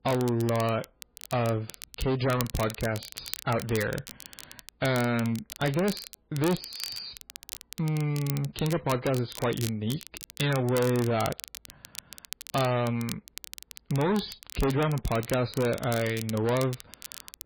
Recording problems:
distortion; heavy; 11% of the sound clipped
garbled, watery; badly
crackle, like an old record; noticeable; 10 dB below the speech

